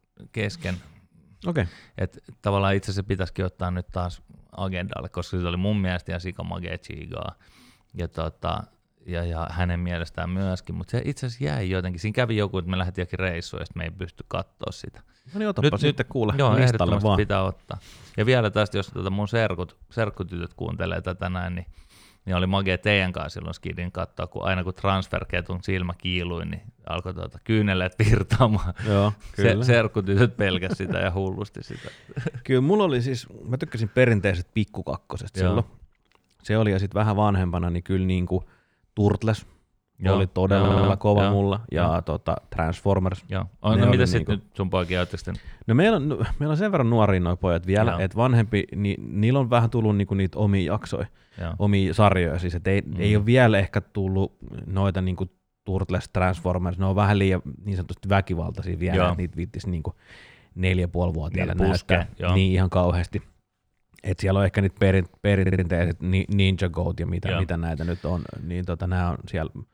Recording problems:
audio stuttering; at 41 s and at 1:05

